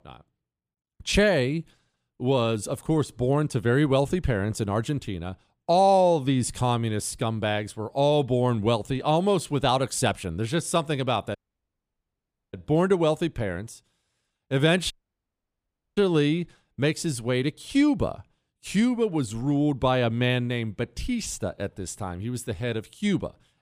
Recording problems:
audio cutting out; at 11 s for 1 s and at 15 s for 1 s

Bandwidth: 15 kHz